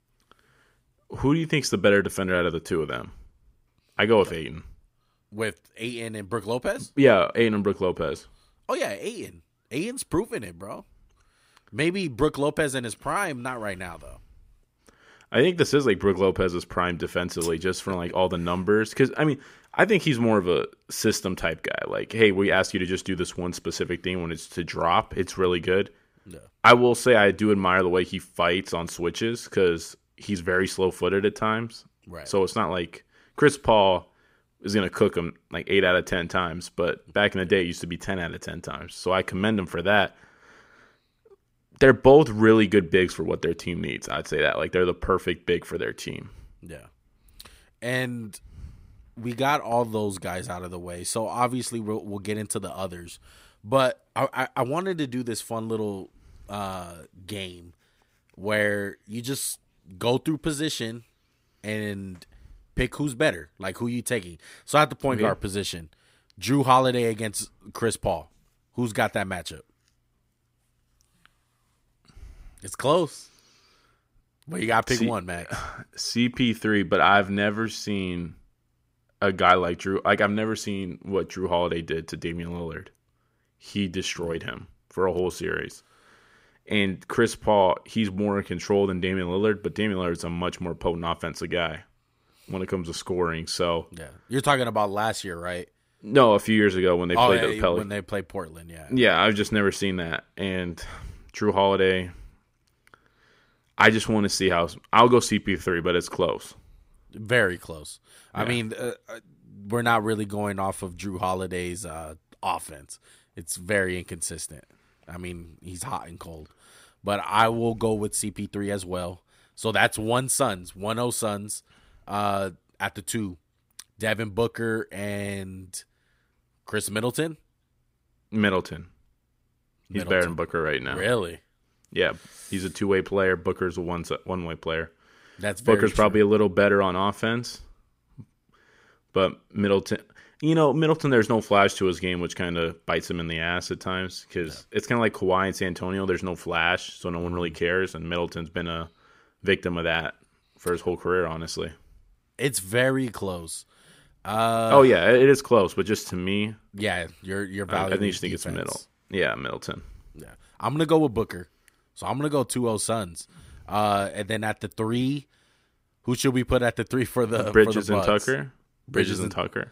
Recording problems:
none

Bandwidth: 15.5 kHz